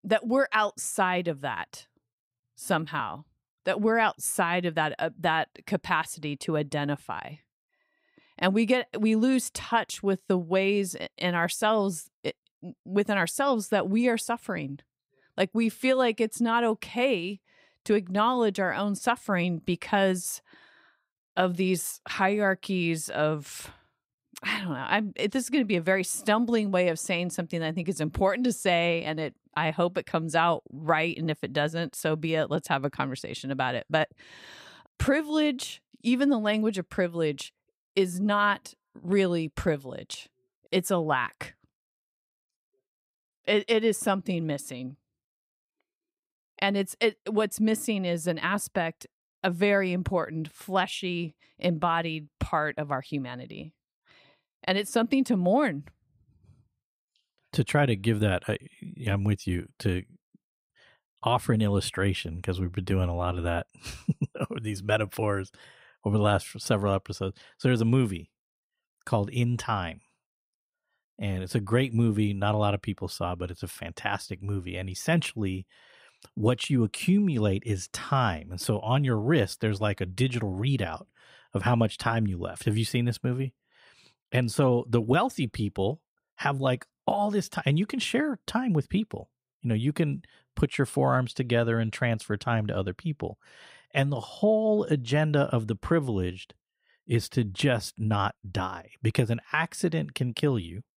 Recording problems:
none

